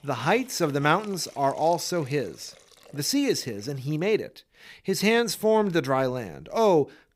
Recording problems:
hiss; faint; throughout; 25 dB below the speech

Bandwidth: 15.5 kHz